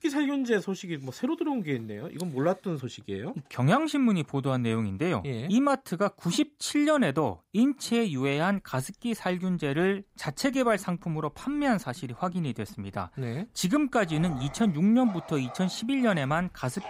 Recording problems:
animal sounds; noticeable; from 8.5 s on; 20 dB below the speech

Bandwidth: 15.5 kHz